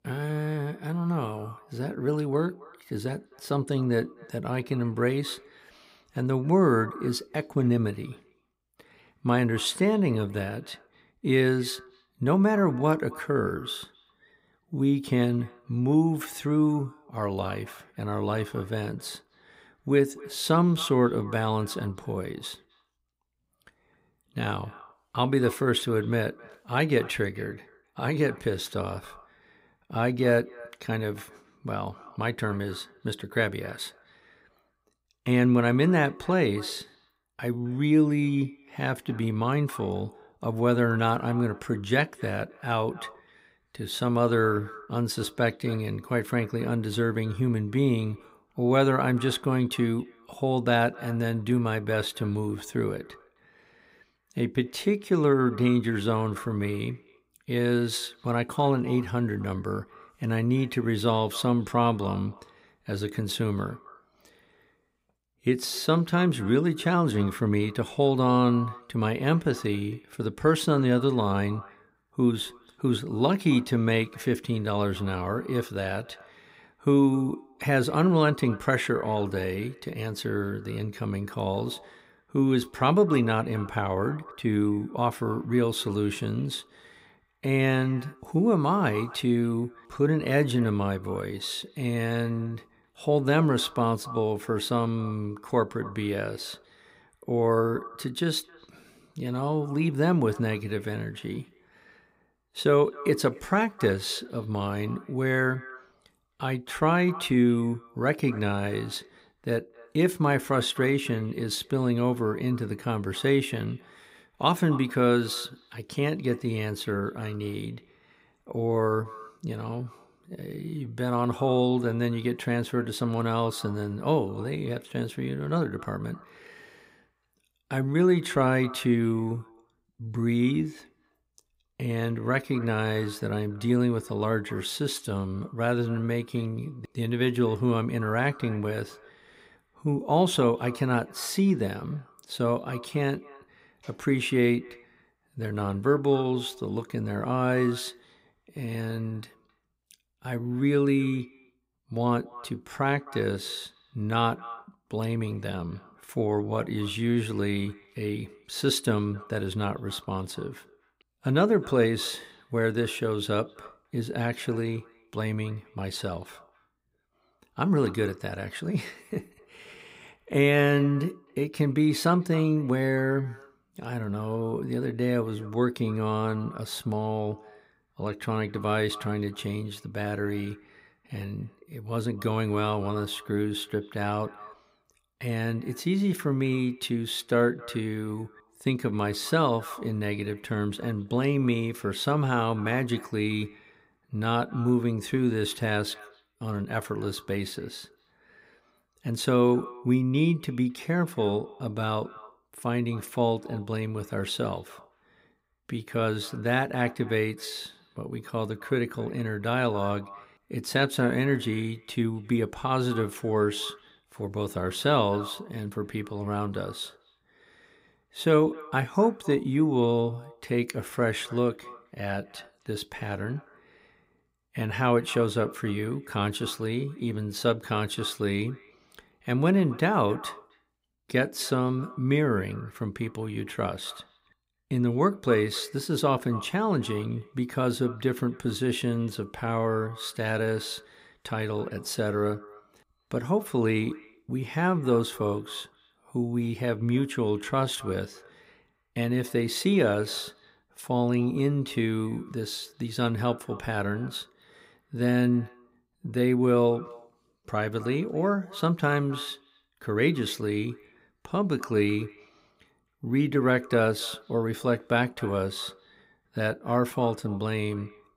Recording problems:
echo of what is said; faint; throughout; 260 ms later, 20 dB below the speech

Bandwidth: 15.5 kHz